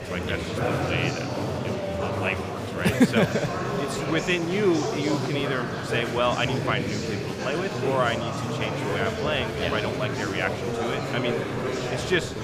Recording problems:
murmuring crowd; loud; throughout; 1 dB below the speech

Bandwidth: 15 kHz